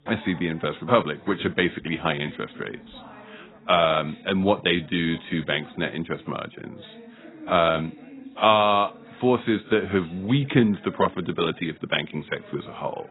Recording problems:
garbled, watery; badly; nothing above 4 kHz
background chatter; faint; throughout; 2 voices, 25 dB below the speech

